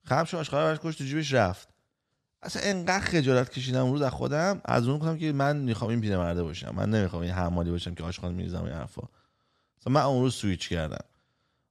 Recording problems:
none

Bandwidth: 13.5 kHz